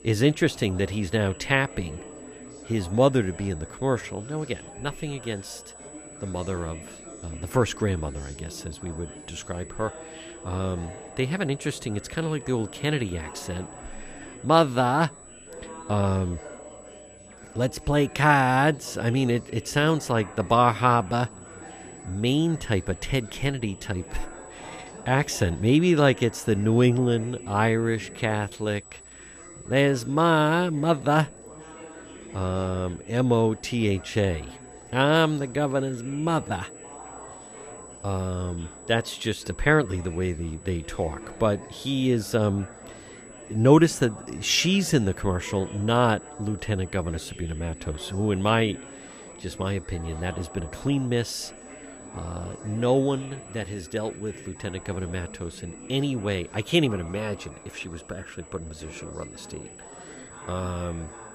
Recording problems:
chatter from many people; noticeable; throughout; 20 dB below the speech
high-pitched whine; faint; throughout; 8 kHz, 20 dB below the speech

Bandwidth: 14.5 kHz